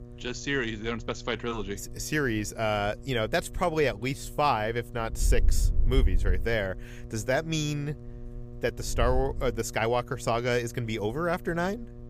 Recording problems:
wind noise on the microphone; occasional gusts; 20 dB below the speech
electrical hum; faint; throughout; 60 Hz, 25 dB below the speech

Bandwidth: 15 kHz